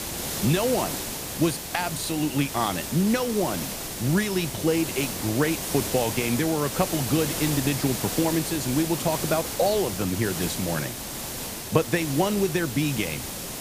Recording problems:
hiss; loud; throughout; 4 dB below the speech

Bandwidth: 15 kHz